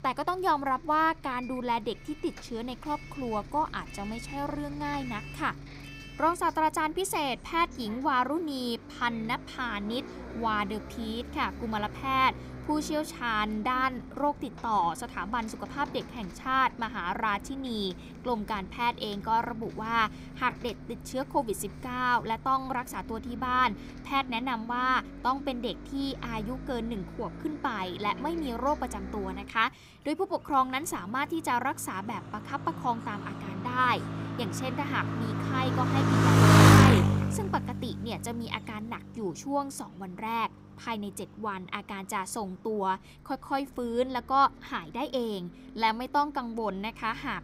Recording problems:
traffic noise; very loud; throughout; 2 dB above the speech

